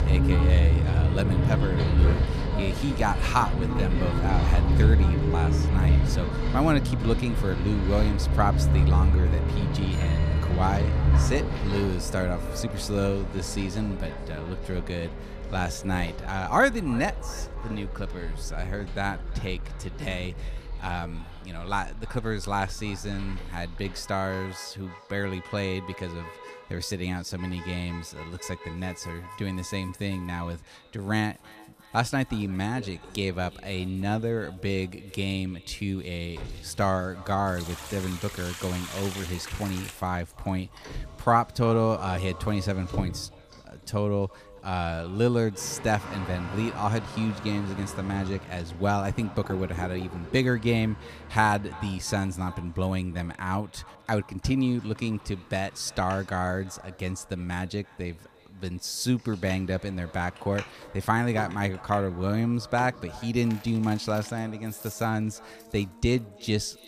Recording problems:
echo of what is said; faint; throughout; 340 ms later, 20 dB below the speech
traffic noise; very loud; throughout; 2 dB above the speech
household noises; noticeable; throughout; 15 dB below the speech

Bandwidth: 14.5 kHz